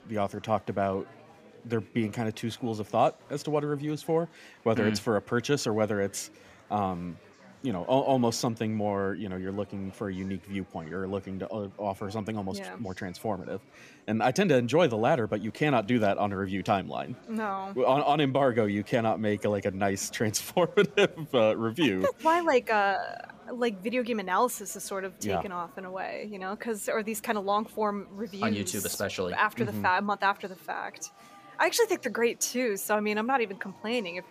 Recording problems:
chatter from many people; faint; throughout; 25 dB below the speech

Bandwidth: 15 kHz